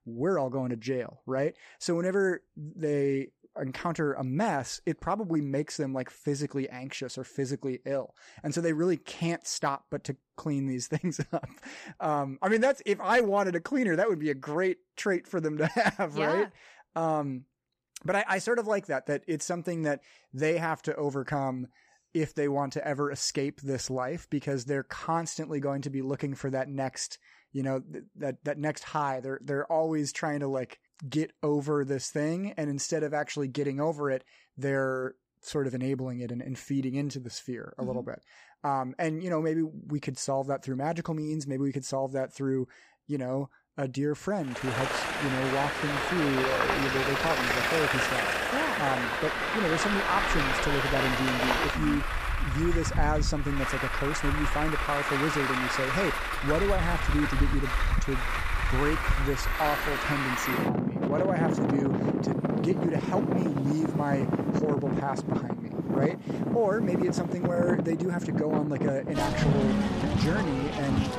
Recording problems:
traffic noise; very loud; from 45 s on; 2 dB above the speech

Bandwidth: 14.5 kHz